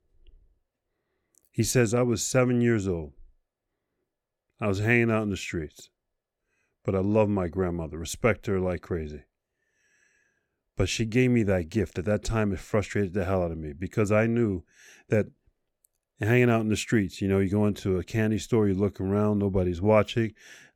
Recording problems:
none

